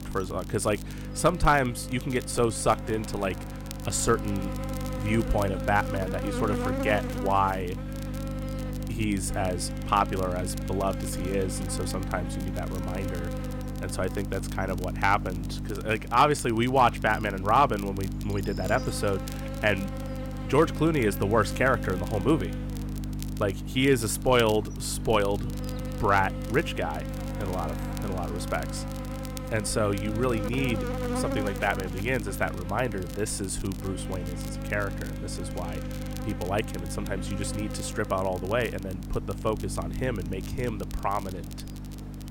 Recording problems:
electrical hum; noticeable; throughout; 50 Hz, 10 dB below the speech
hiss; faint; throughout; 25 dB below the speech
crackle, like an old record; faint; 20 dB below the speech

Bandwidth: 16.5 kHz